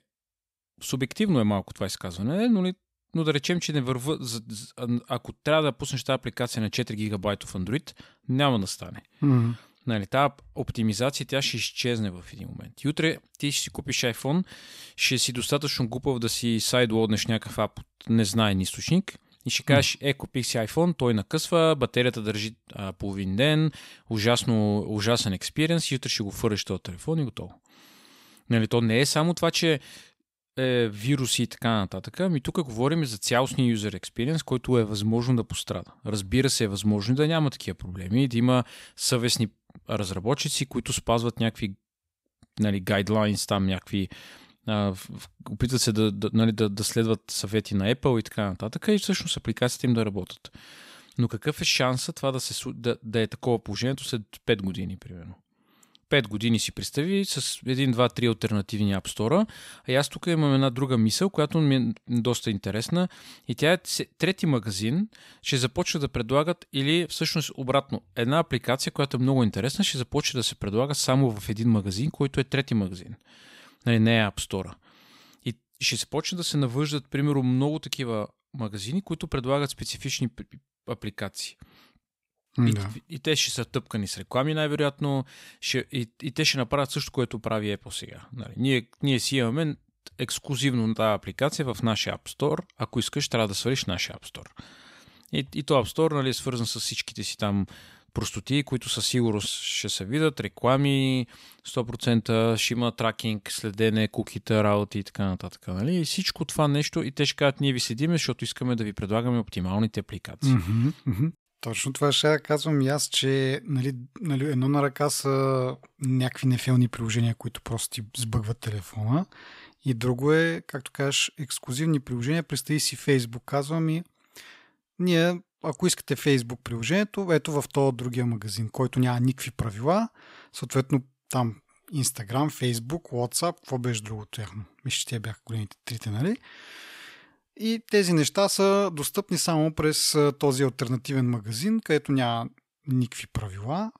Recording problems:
none

